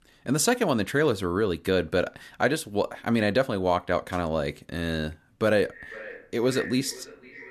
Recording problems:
echo of what is said; noticeable; from 5.5 s on; 490 ms later, 15 dB below the speech

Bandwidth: 13.5 kHz